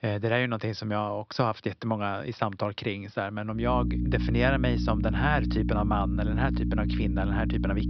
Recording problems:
high frequencies cut off; noticeable; nothing above 5.5 kHz
electrical hum; loud; from 3.5 s on; 60 Hz, 8 dB below the speech

